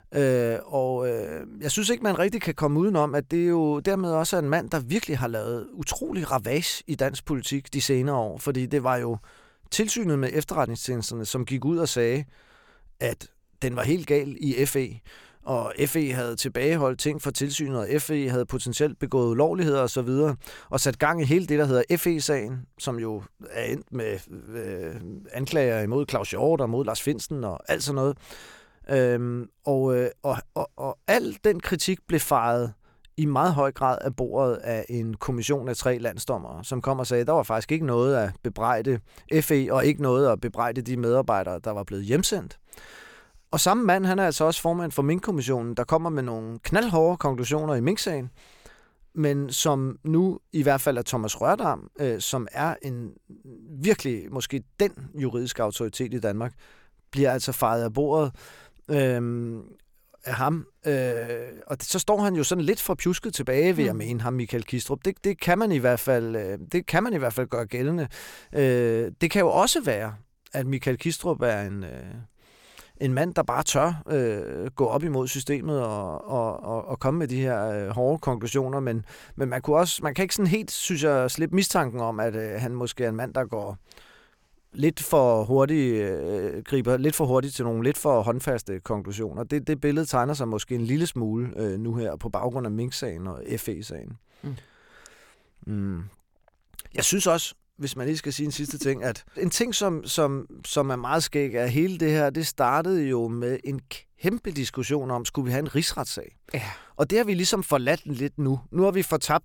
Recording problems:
none

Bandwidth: 17.5 kHz